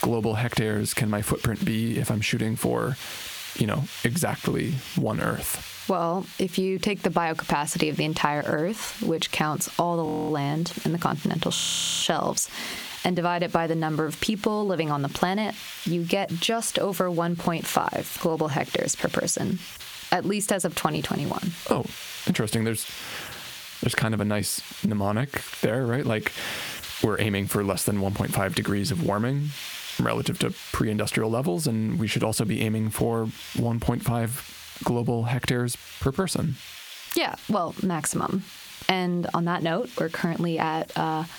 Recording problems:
squashed, flat; heavily
hiss; noticeable; throughout; 15 dB below the speech
audio freezing; at 10 s and at 12 s

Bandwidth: 18.5 kHz